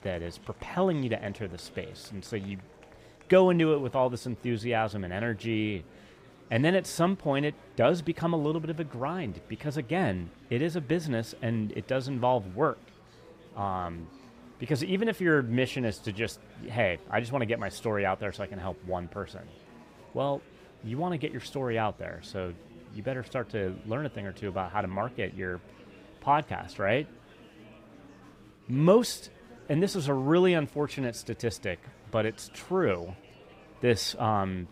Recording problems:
murmuring crowd; faint; throughout; 25 dB below the speech

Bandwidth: 15.5 kHz